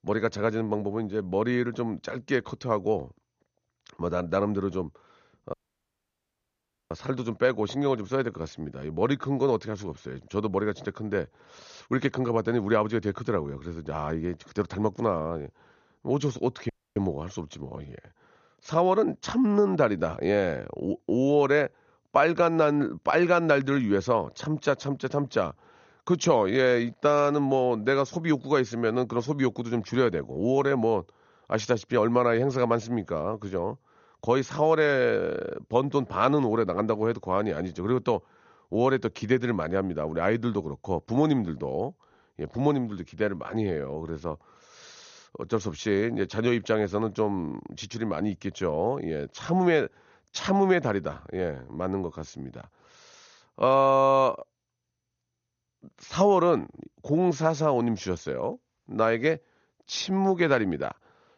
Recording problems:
garbled, watery; slightly; nothing above 6.5 kHz
audio cutting out; at 5.5 s for 1.5 s and at 17 s

